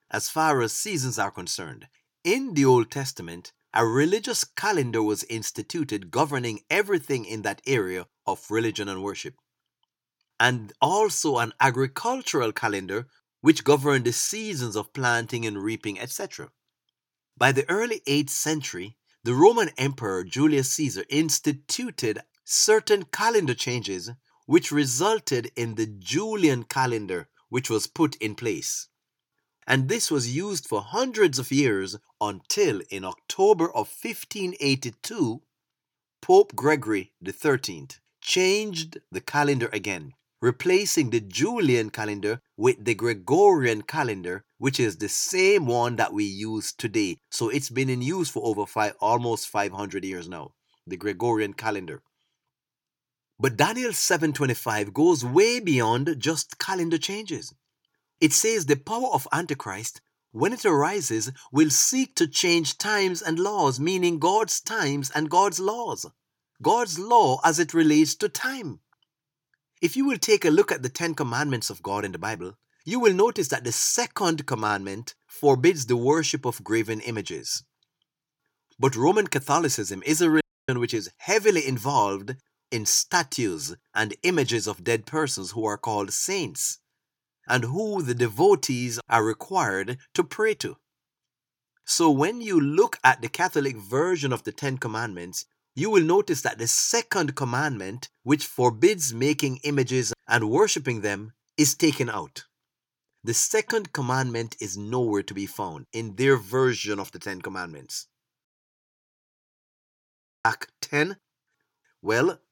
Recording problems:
audio cutting out; at 1:20 and at 1:48 for 2 s

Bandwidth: 18 kHz